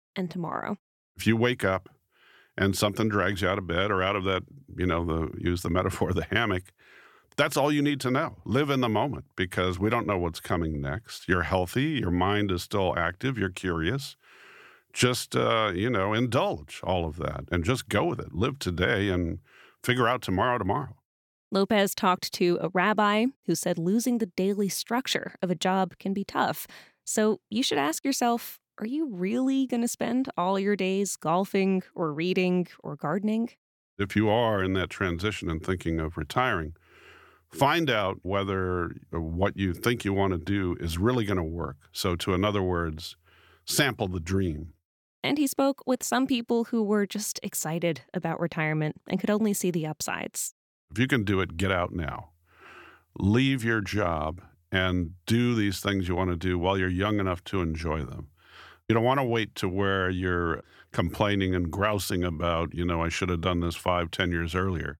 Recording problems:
none

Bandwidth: 17.5 kHz